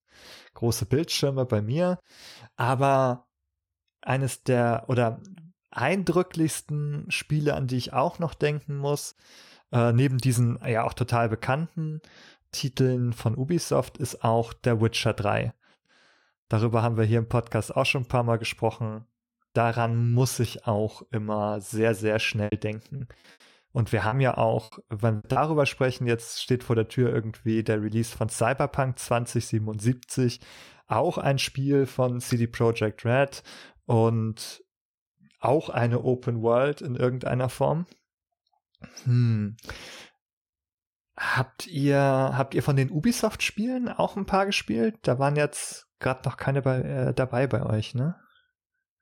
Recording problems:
choppy; very; from 22 to 25 s; 16% of the speech affected

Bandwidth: 17 kHz